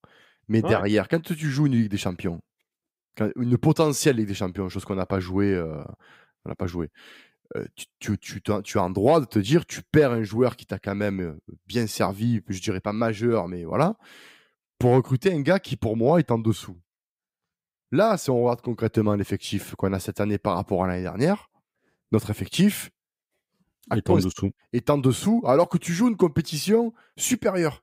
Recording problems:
none

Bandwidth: 15.5 kHz